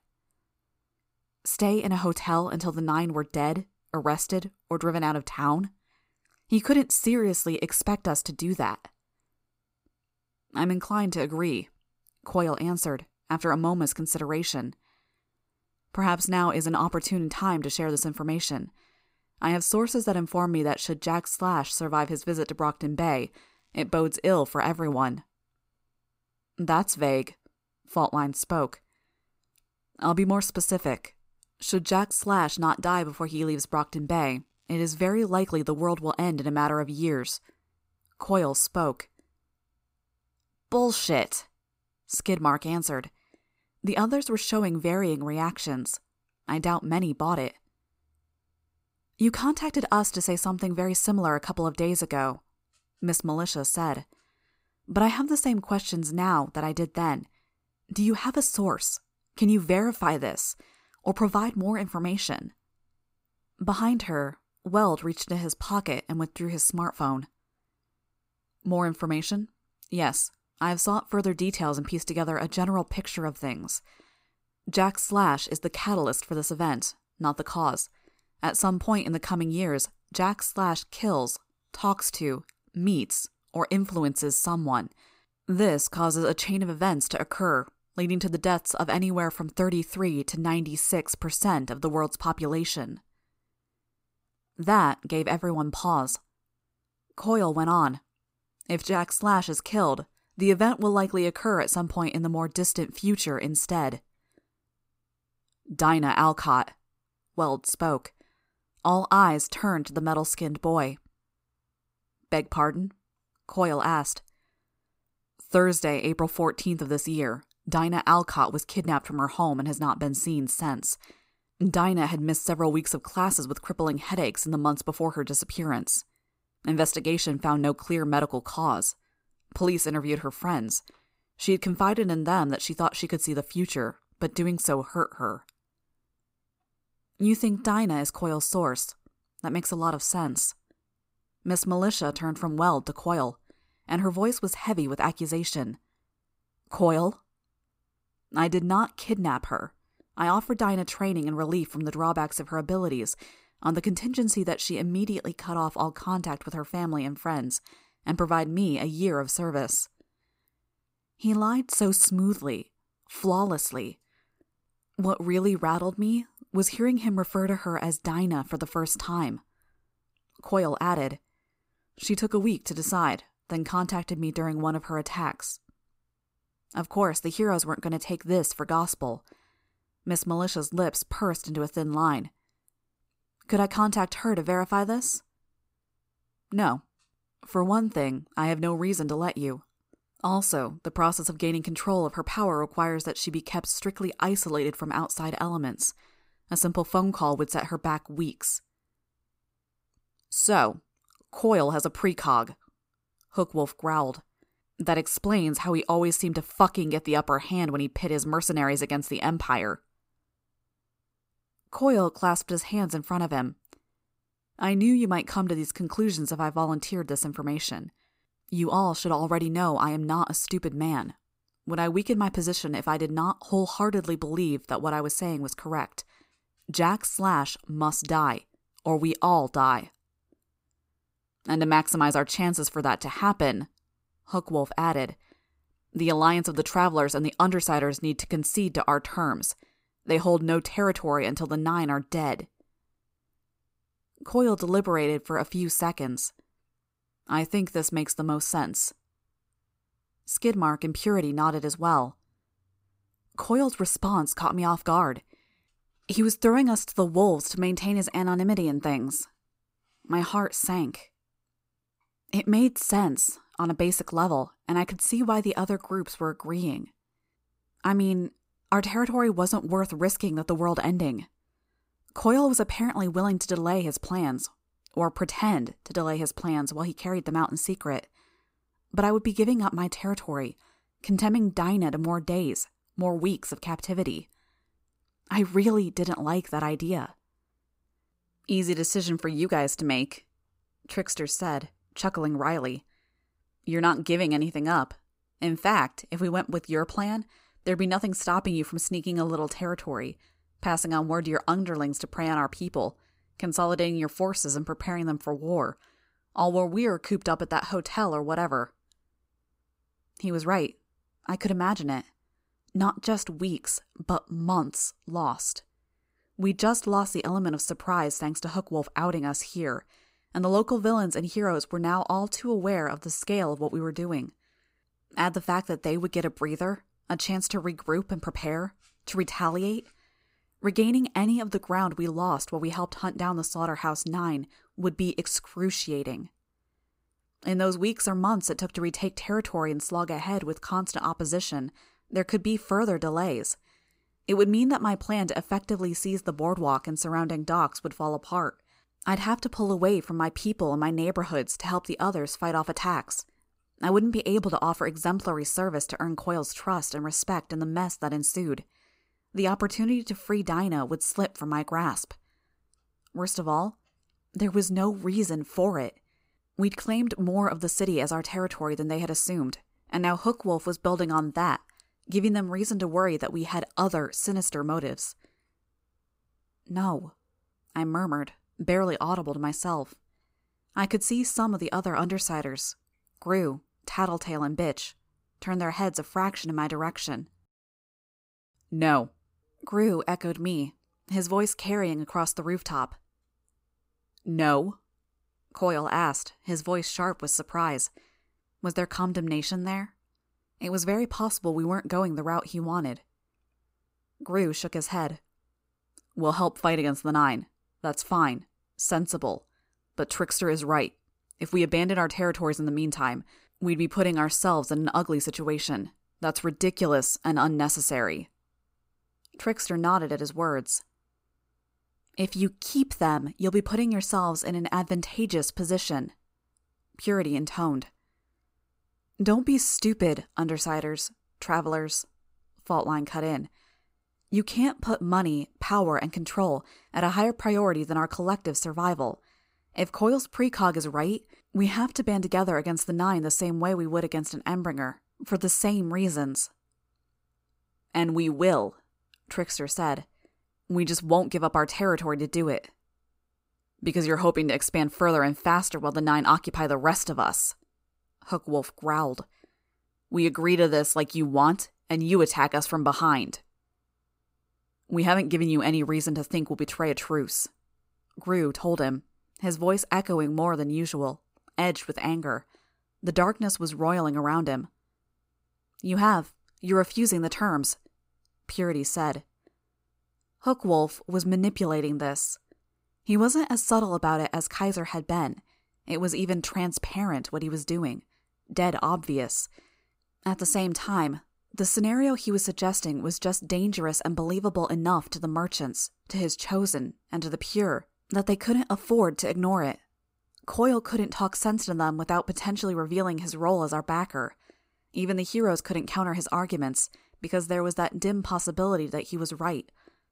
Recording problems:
none

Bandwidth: 15.5 kHz